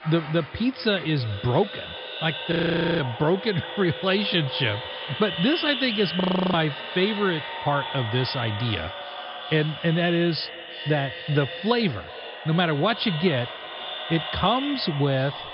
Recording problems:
echo of what is said; strong; throughout; 380 ms later, 8 dB below the speech
high frequencies cut off; noticeable; nothing above 5.5 kHz
household noises; faint; throughout; 25 dB below the speech
audio freezing; at 2.5 s and at 6 s

